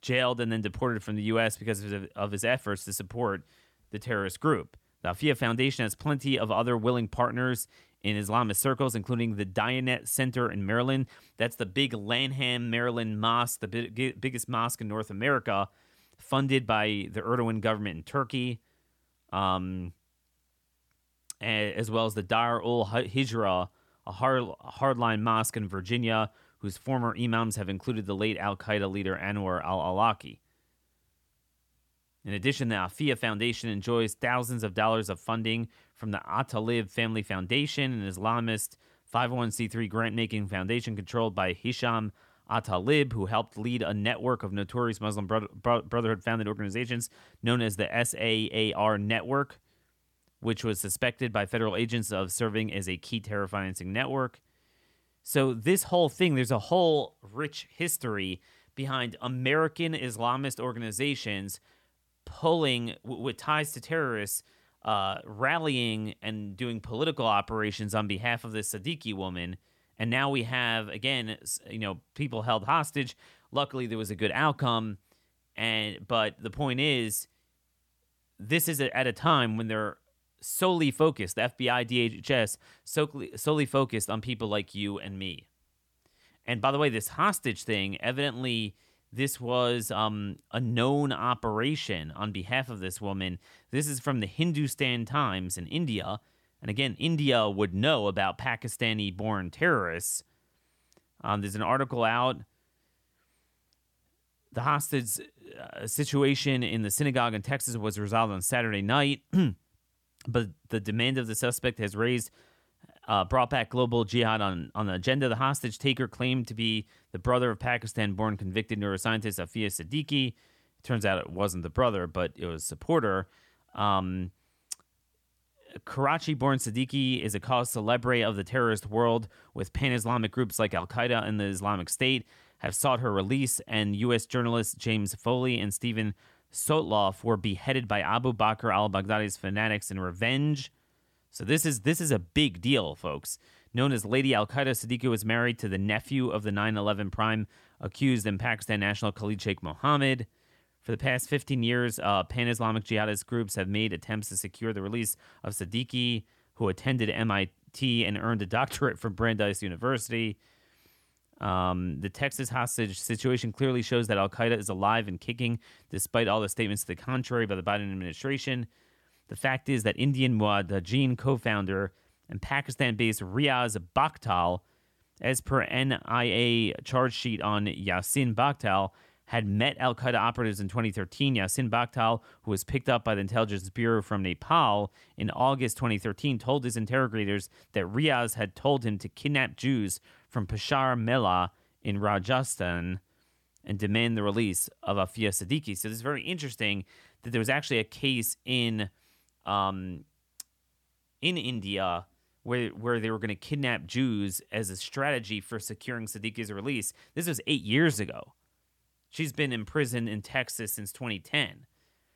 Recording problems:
none

